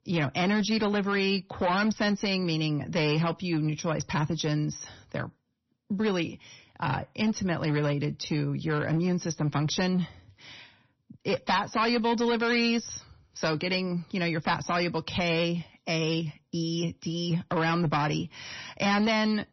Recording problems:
distortion; slight; 8% of the sound clipped
garbled, watery; slightly; nothing above 6 kHz

